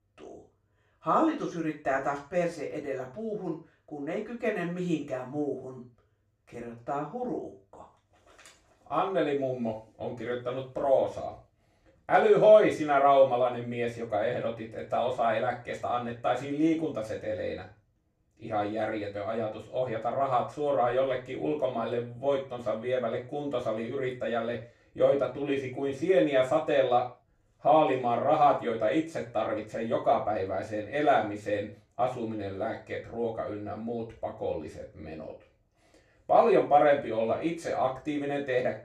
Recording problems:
off-mic speech; far
room echo; slight; dies away in 0.3 s

